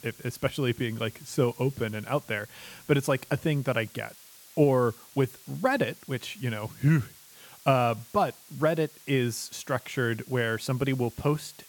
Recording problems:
hiss; faint; throughout; 20 dB below the speech

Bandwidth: 17.5 kHz